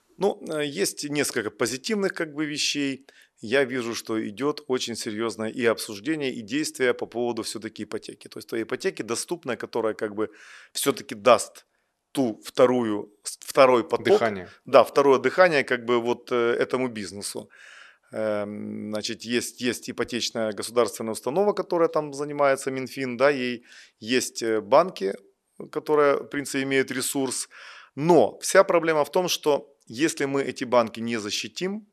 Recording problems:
none

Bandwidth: 13.5 kHz